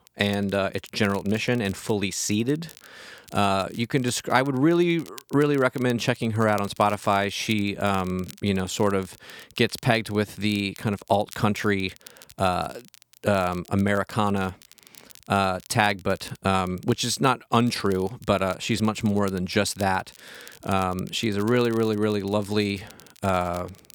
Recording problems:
crackle, like an old record; faint; 25 dB below the speech

